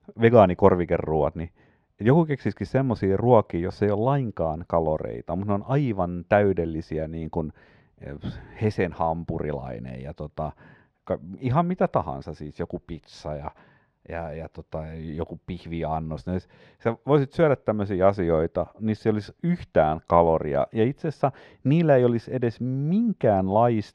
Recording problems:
muffled; slightly; fading above 3.5 kHz

